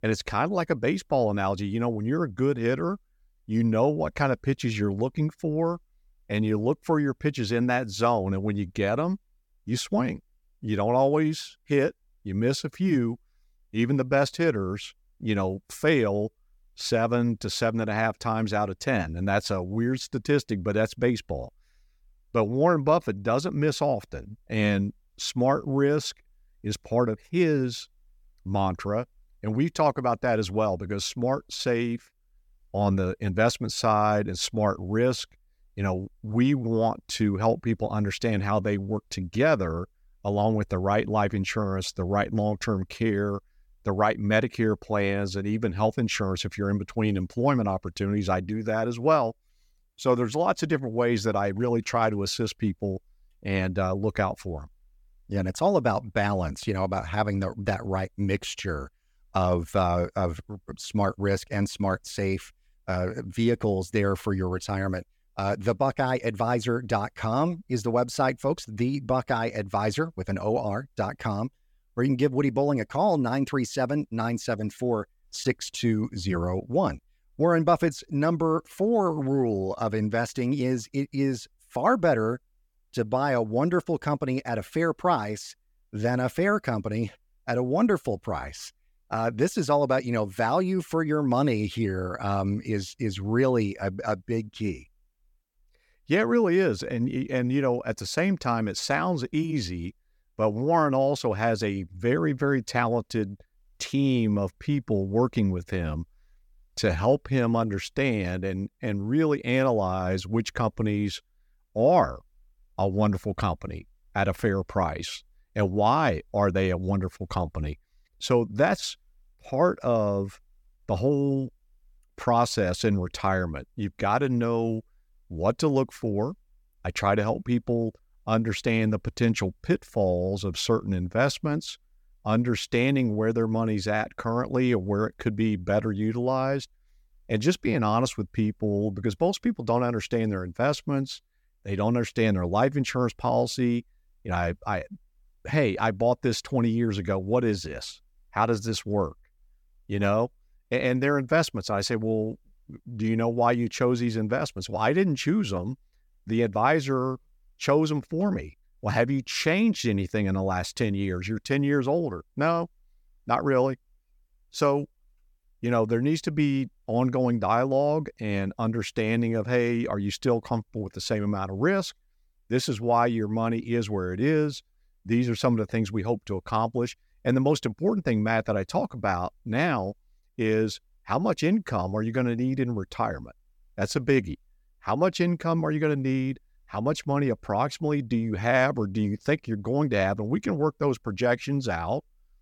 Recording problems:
none

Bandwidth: 18 kHz